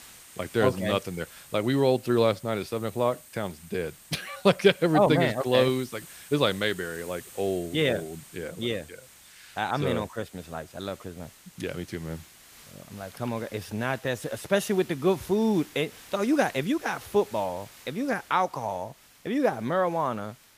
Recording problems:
hiss; faint; throughout; 20 dB below the speech

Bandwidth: 15 kHz